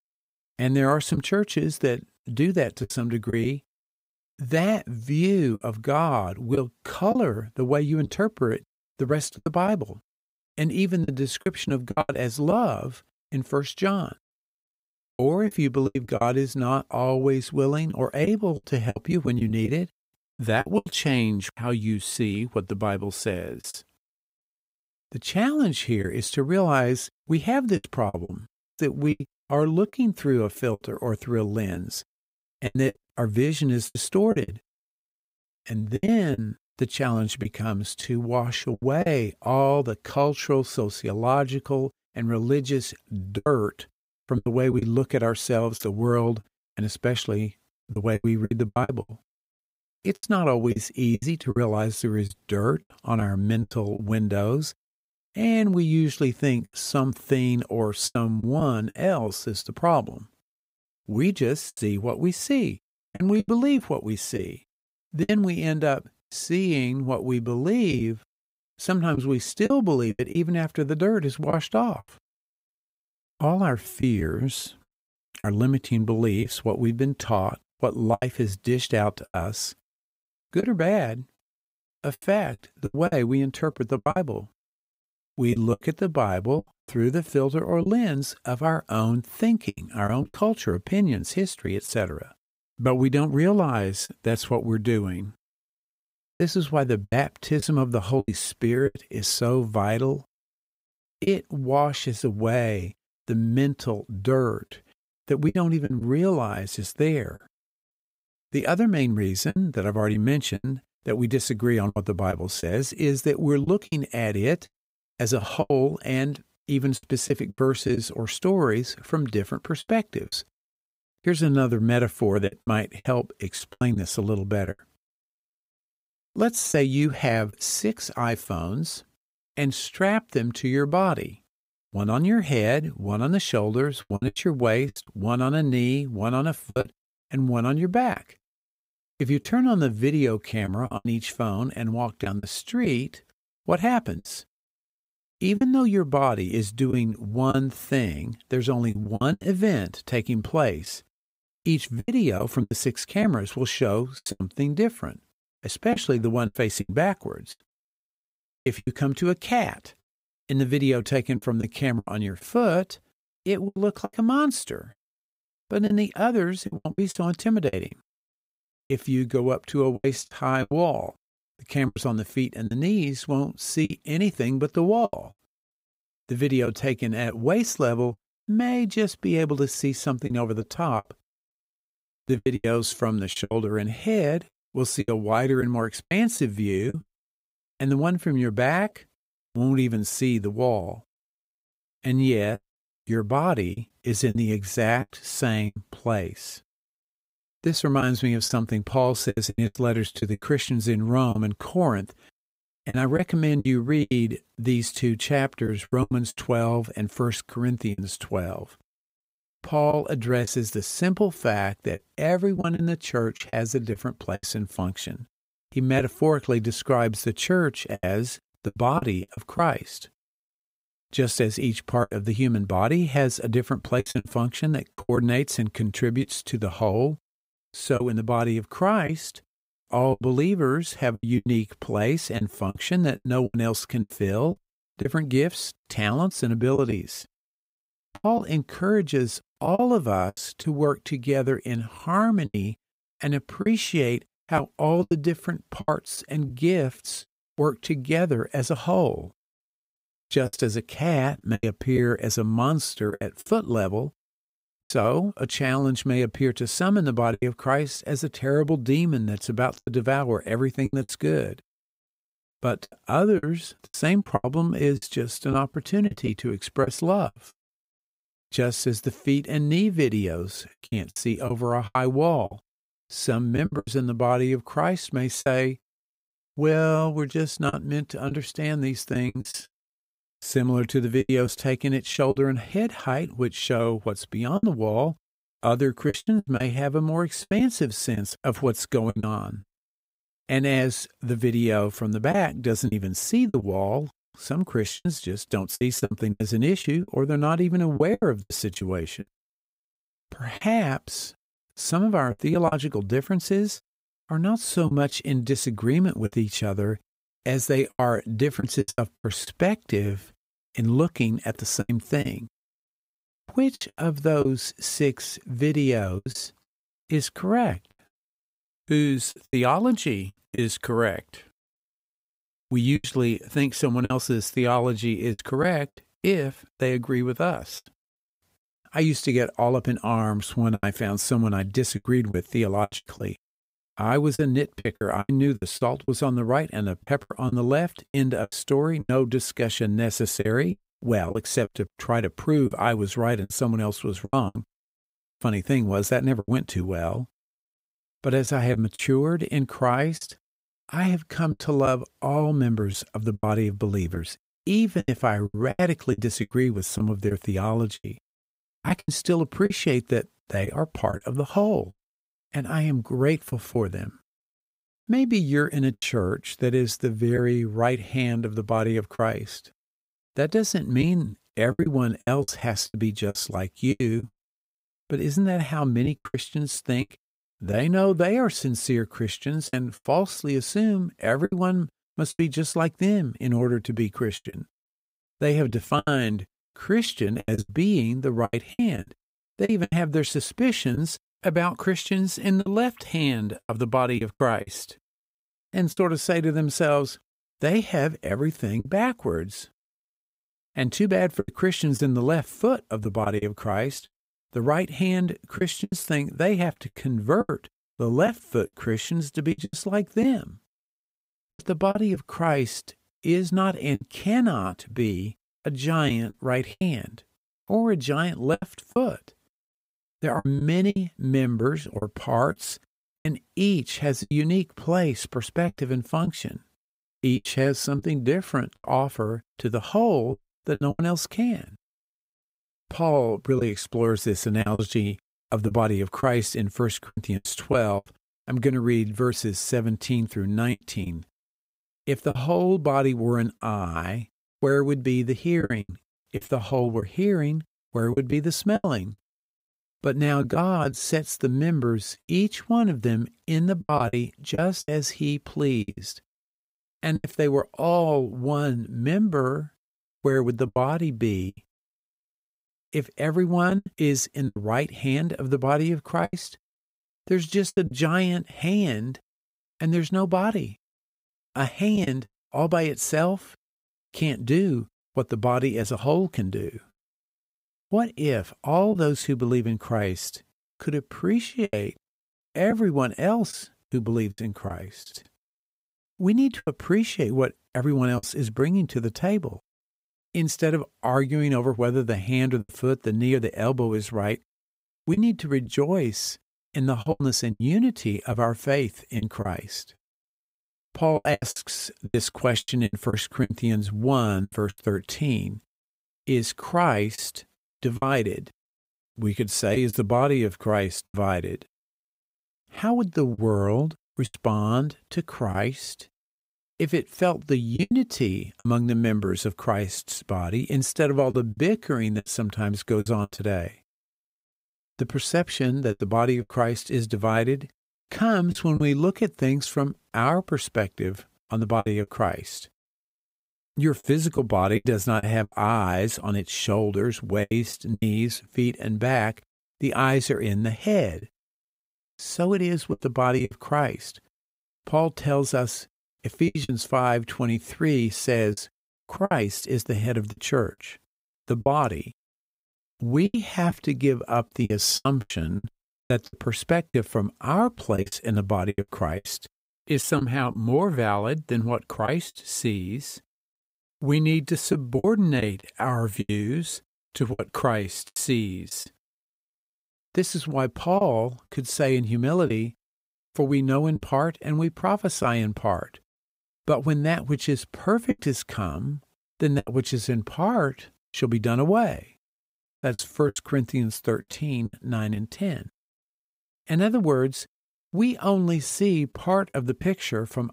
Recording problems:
choppy; very; 7% of the speech affected

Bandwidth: 15.5 kHz